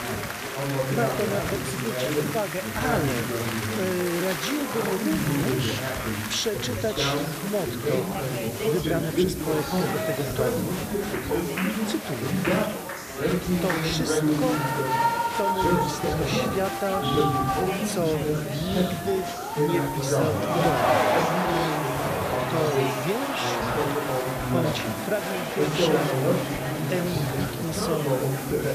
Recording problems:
chatter from many people; very loud; throughout; 4 dB above the speech
hiss; loud; throughout; 10 dB below the speech

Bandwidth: 14.5 kHz